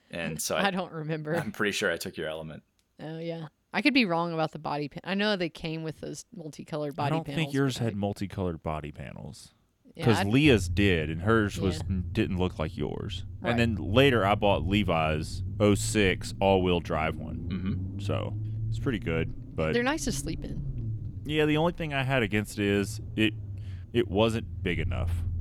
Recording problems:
low rumble; faint; from 10 s on; 20 dB below the speech

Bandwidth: 18 kHz